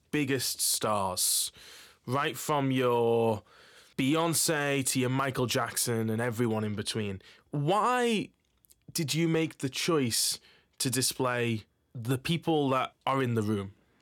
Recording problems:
none

